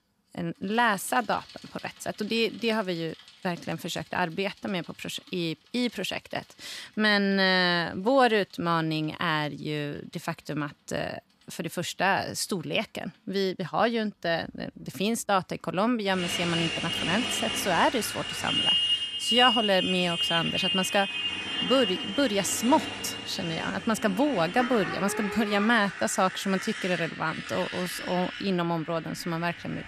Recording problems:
traffic noise; loud; throughout; 2 dB below the speech

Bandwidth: 14.5 kHz